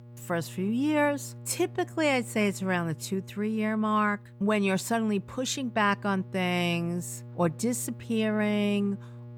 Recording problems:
electrical hum; faint; throughout; 60 Hz, 25 dB below the speech

